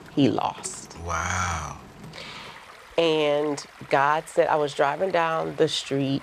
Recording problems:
rain or running water; faint; throughout; 20 dB below the speech

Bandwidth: 14.5 kHz